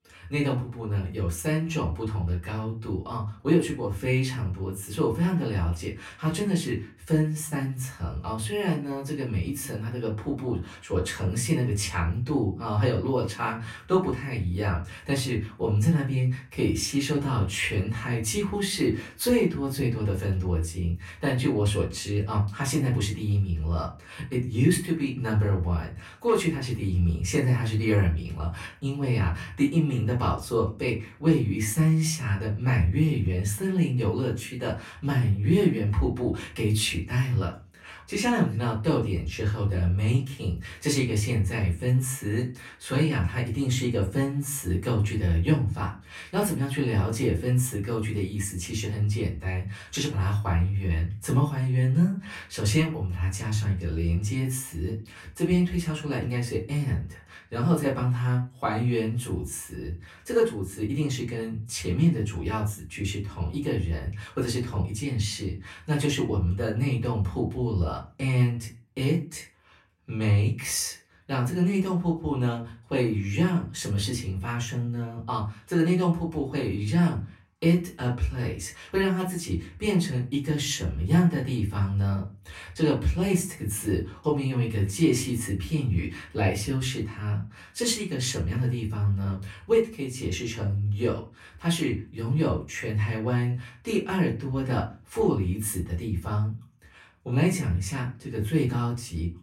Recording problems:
off-mic speech; far
room echo; very slight; dies away in 0.3 s

